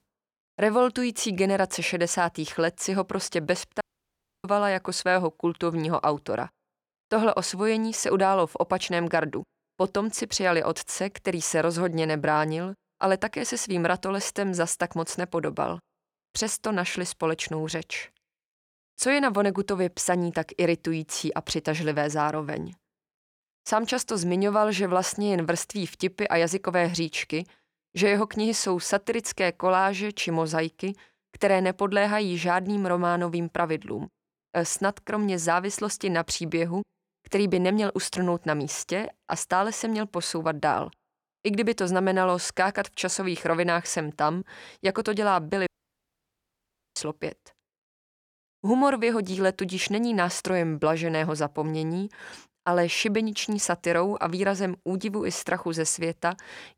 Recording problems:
audio cutting out; at 4 s for 0.5 s and at 46 s for 1.5 s

